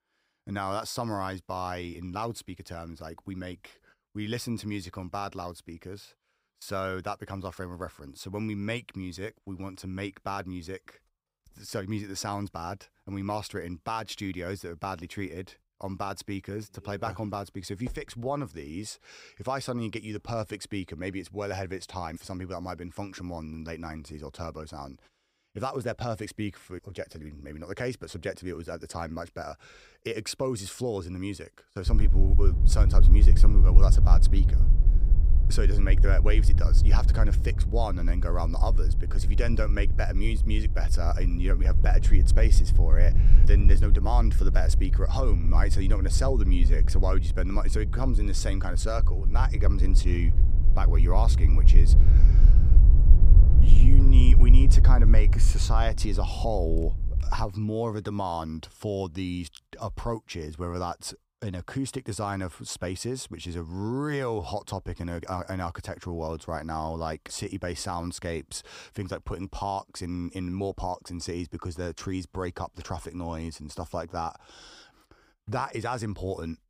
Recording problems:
wind noise on the microphone; heavy; from 32 to 57 s; 8 dB below the speech

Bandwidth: 15.5 kHz